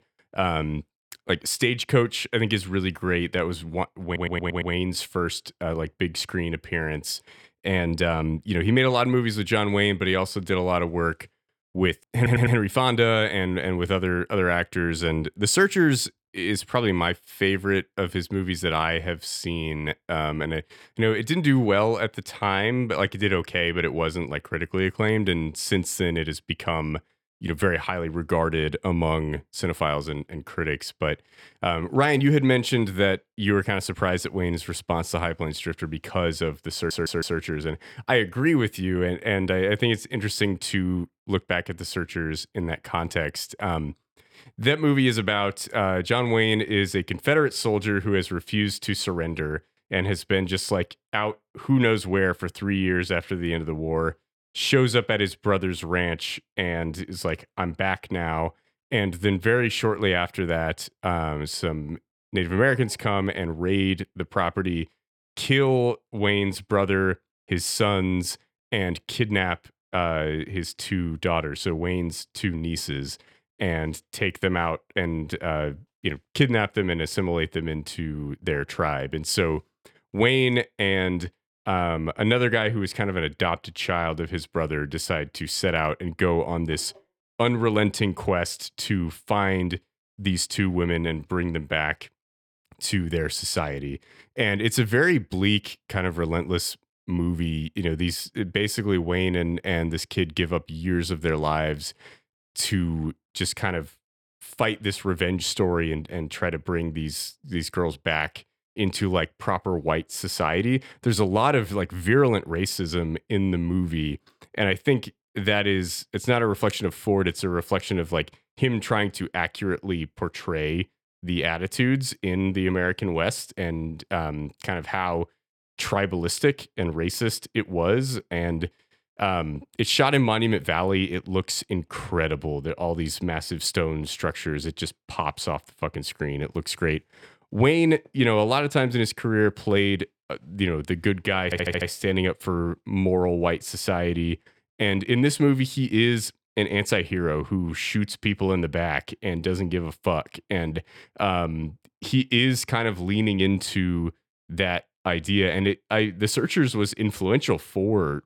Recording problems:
audio stuttering; 4 times, first at 4 s

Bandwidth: 18 kHz